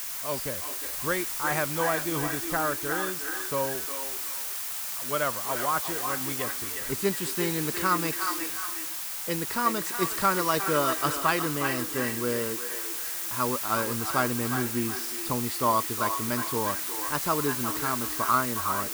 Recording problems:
echo of what is said; strong; throughout; 360 ms later, 7 dB below the speech
hiss; loud; throughout; as loud as the speech

